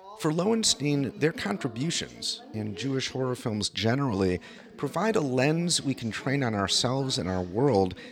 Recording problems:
background chatter; noticeable; throughout; 2 voices, 20 dB below the speech

